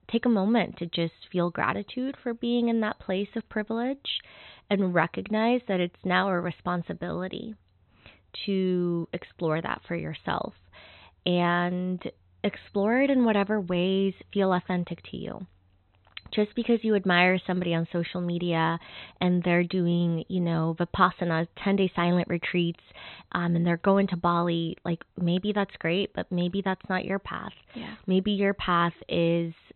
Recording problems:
high frequencies cut off; severe; nothing above 4 kHz

